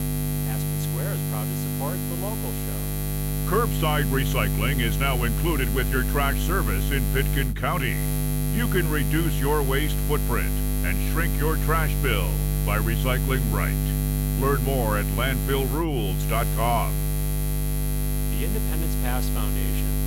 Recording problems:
electrical hum; loud; throughout; 50 Hz, 6 dB below the speech

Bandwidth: 16 kHz